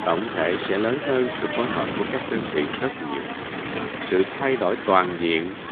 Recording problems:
phone-call audio; nothing above 3.5 kHz
wind noise on the microphone; heavy; 5 dB below the speech

